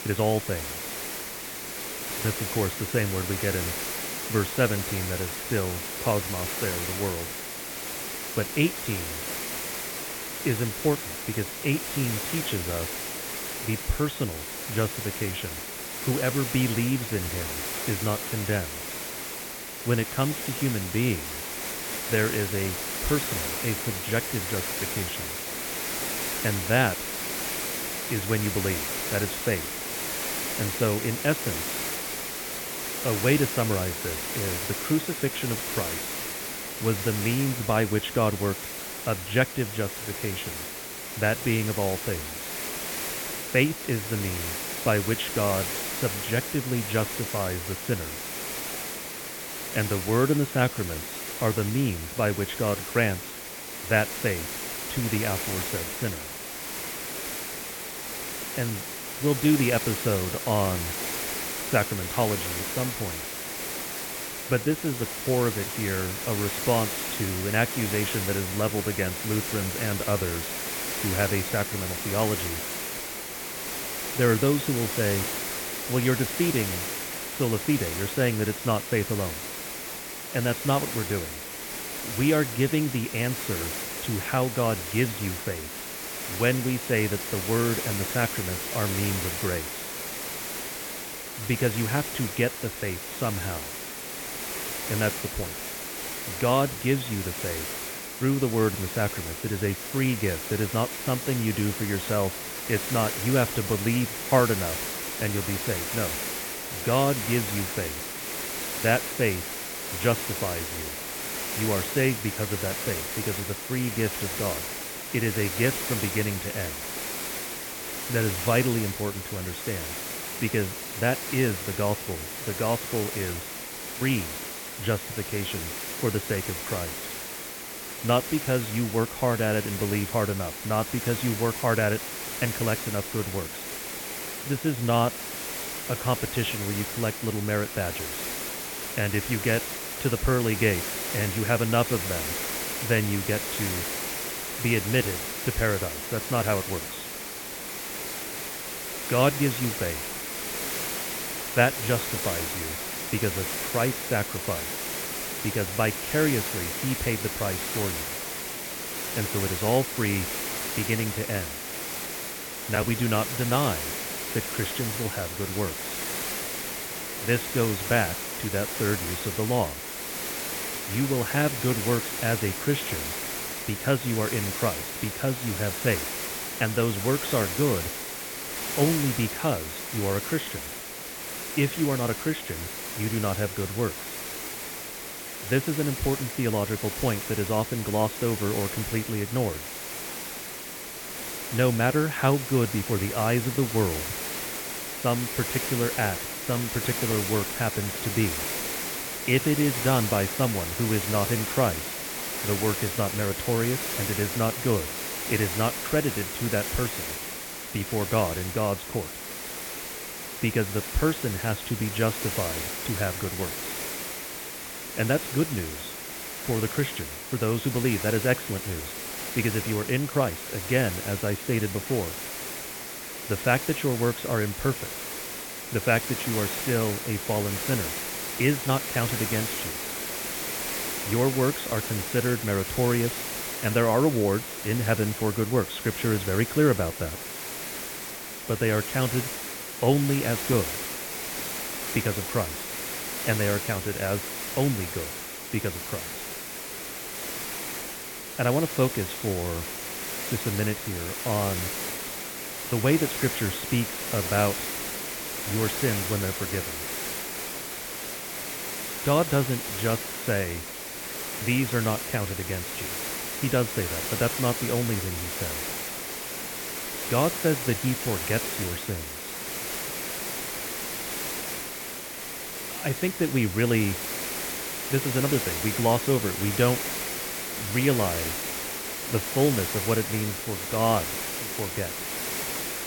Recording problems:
high frequencies cut off; severe; nothing above 4 kHz
hiss; loud; throughout; 3 dB below the speech

